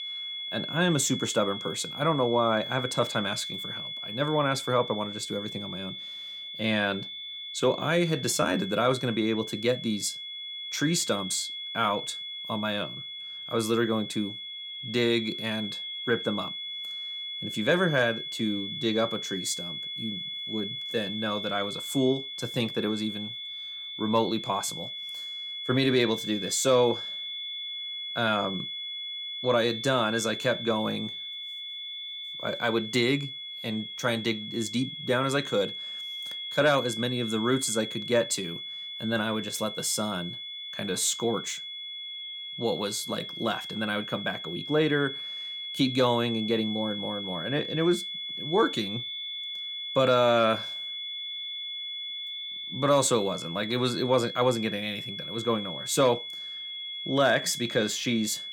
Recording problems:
high-pitched whine; loud; throughout; 3.5 kHz, 6 dB below the speech

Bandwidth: 17.5 kHz